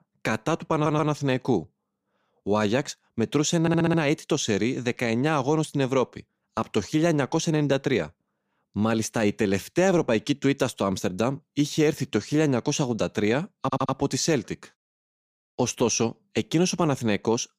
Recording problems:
audio stuttering; at 0.5 s, at 3.5 s and at 14 s

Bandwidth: 15 kHz